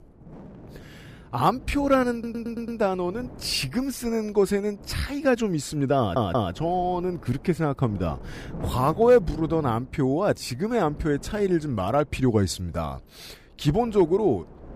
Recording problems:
wind noise on the microphone; occasional gusts; 20 dB below the speech
audio stuttering; at 2 s and at 6 s

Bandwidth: 15 kHz